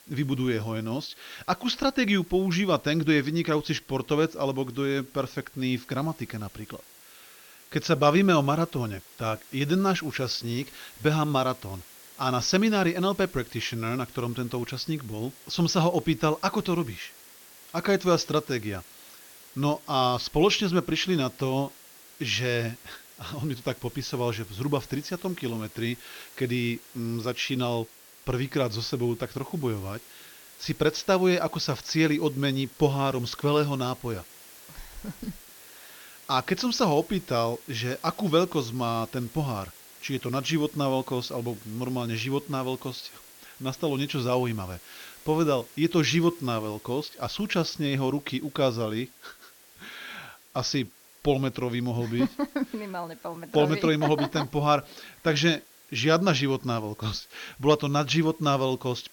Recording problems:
high frequencies cut off; noticeable; nothing above 6.5 kHz
hiss; faint; throughout; 20 dB below the speech

